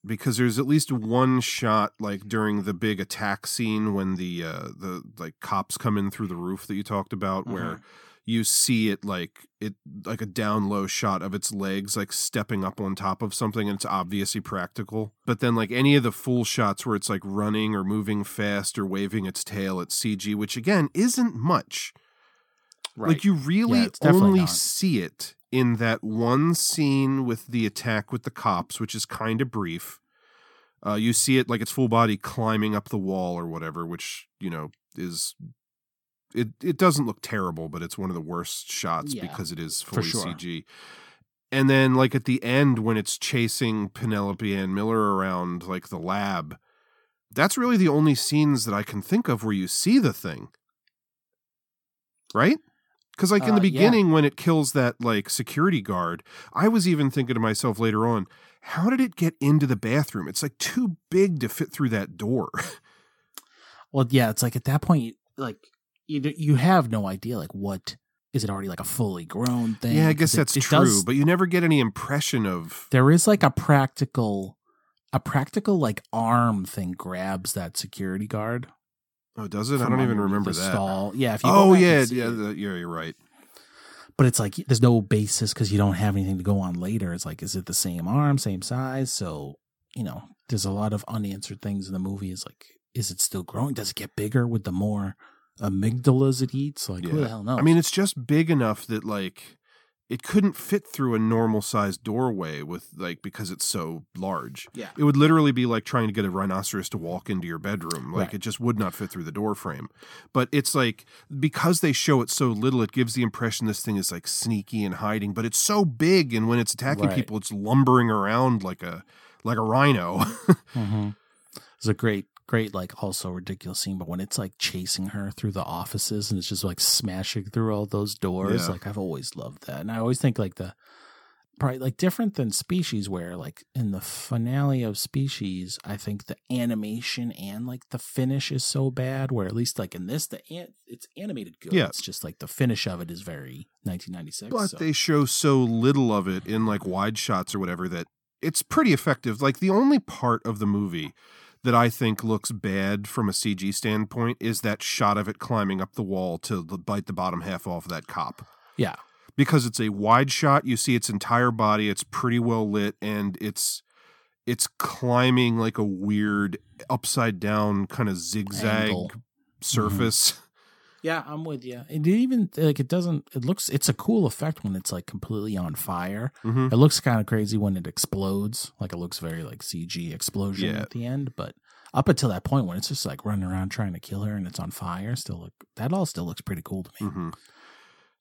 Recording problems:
uneven, jittery; strongly; from 23 s to 2:55

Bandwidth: 17.5 kHz